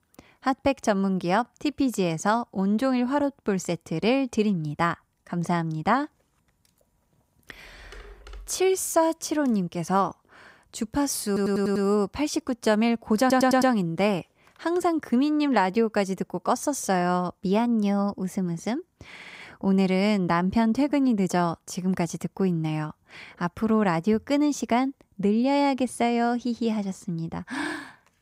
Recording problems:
audio stuttering; at 11 s, at 13 s and at 19 s

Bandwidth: 15.5 kHz